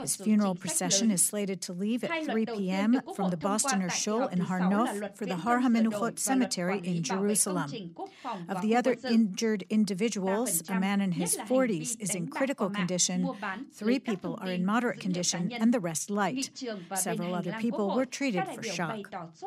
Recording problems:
voice in the background; loud; throughout; 9 dB below the speech

